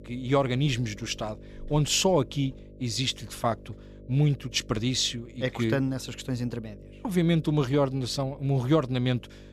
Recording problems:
electrical hum; faint; throughout; 50 Hz, 25 dB below the speech

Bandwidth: 14.5 kHz